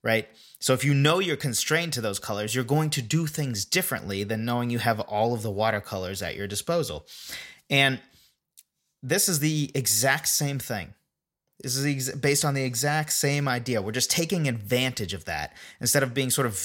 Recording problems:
abrupt cut into speech; at the end

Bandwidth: 16.5 kHz